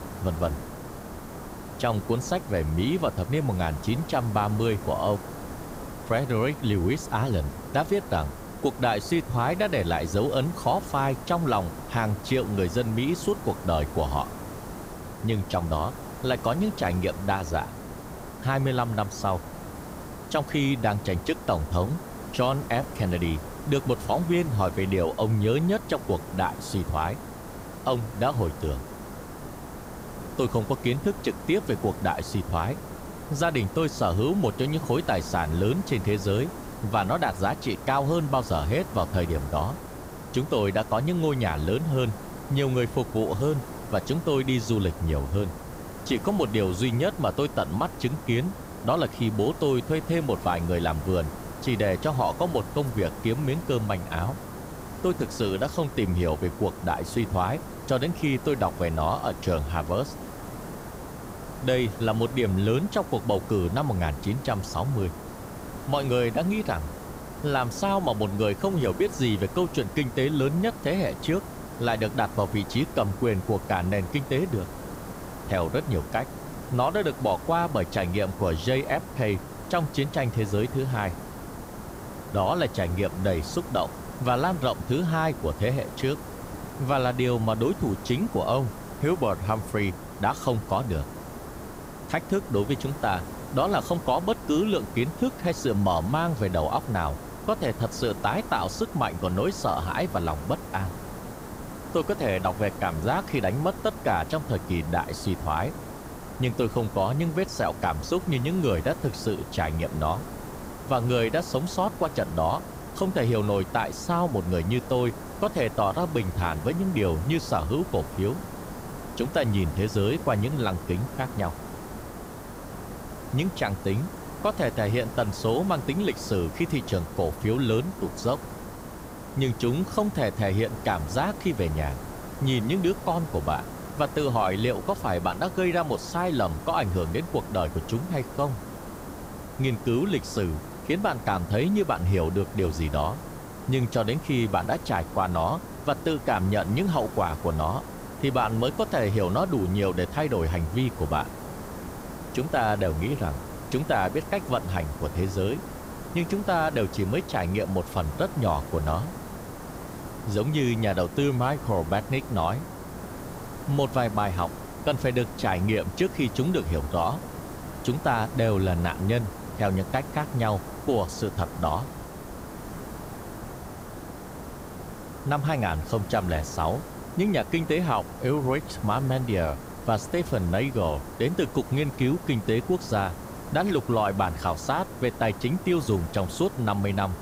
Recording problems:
hiss; noticeable; throughout; 10 dB below the speech

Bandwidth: 15.5 kHz